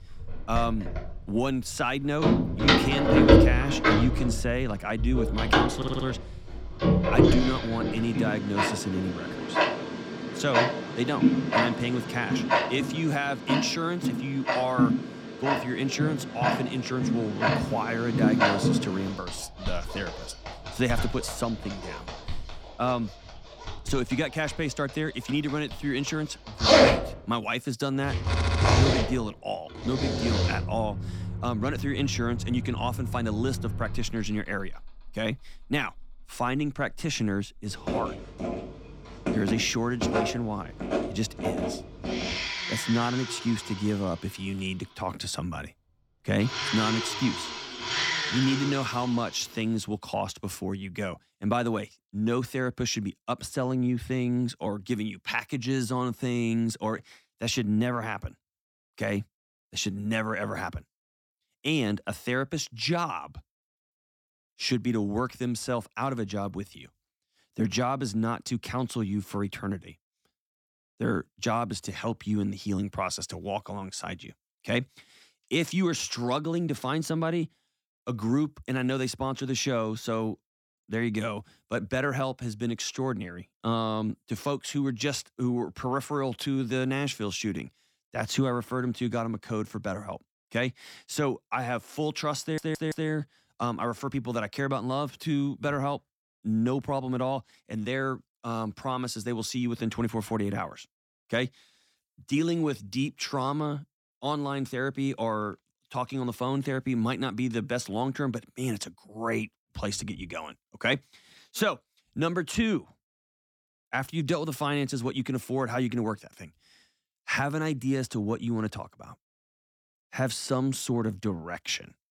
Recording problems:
household noises; very loud; until 49 s; 3 dB above the speech
audio stuttering; at 6 s, at 28 s and at 1:32

